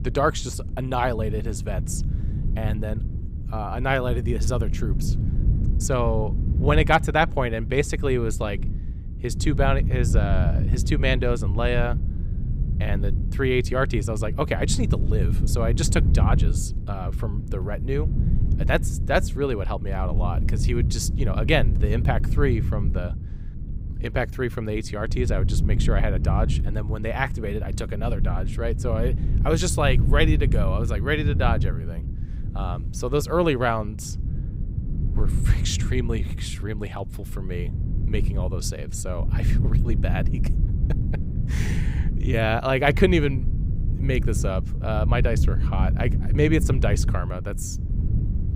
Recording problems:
wind noise on the microphone; occasional gusts; 10 dB below the speech

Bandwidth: 15.5 kHz